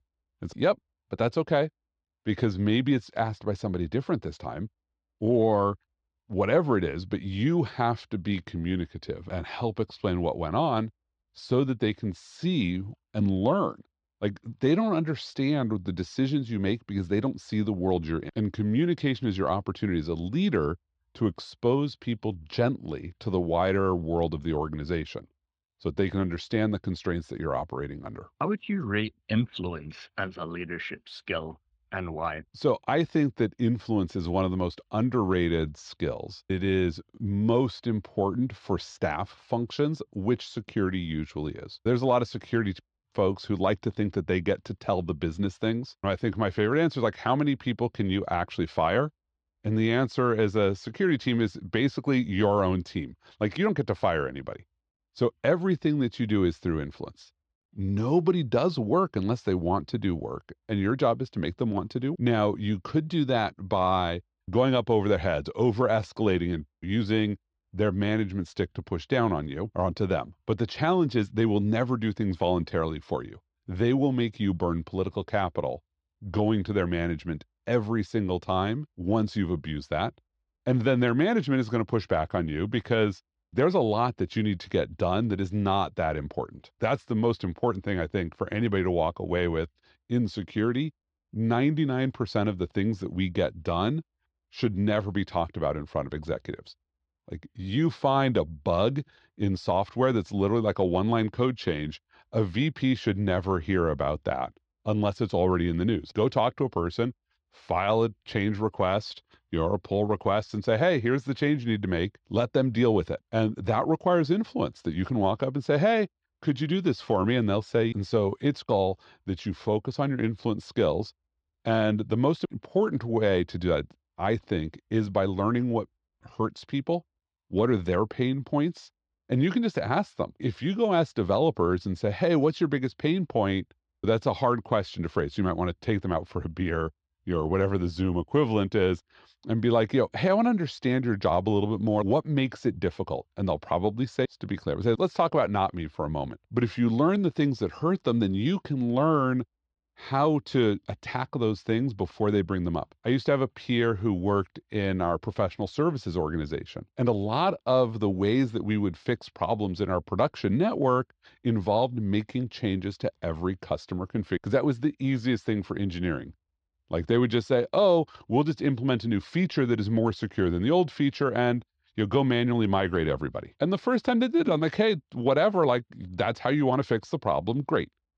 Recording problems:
muffled; slightly; fading above 4 kHz

